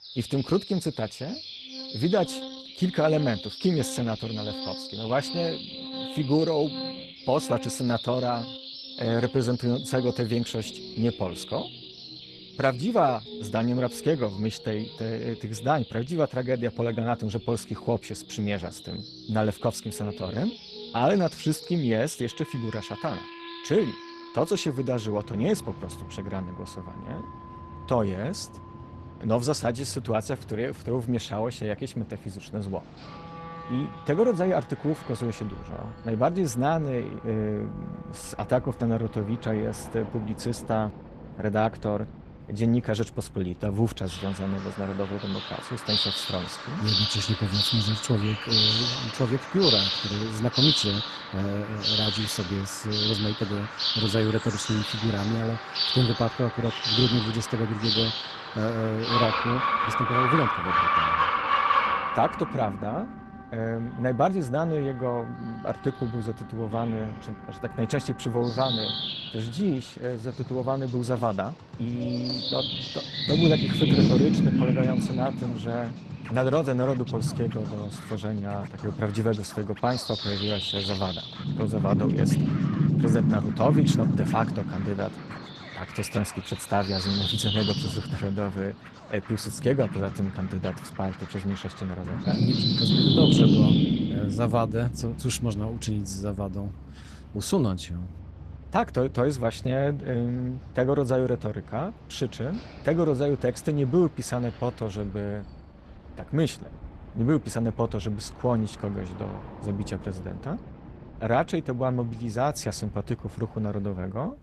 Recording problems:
garbled, watery; slightly; nothing above 14.5 kHz
animal sounds; very loud; throughout; 1 dB above the speech
background music; noticeable; throughout; 15 dB below the speech

